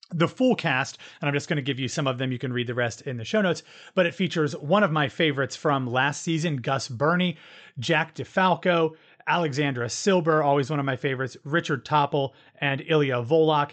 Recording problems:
high frequencies cut off; noticeable; nothing above 8 kHz

